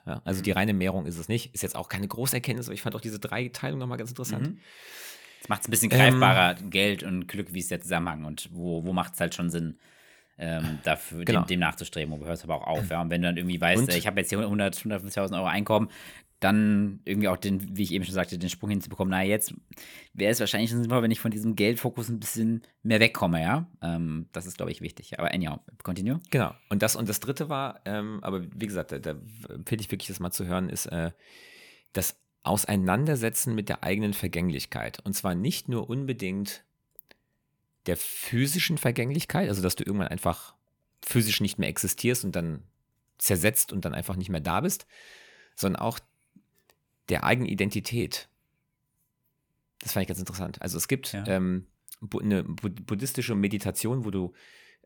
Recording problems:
none

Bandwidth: 18.5 kHz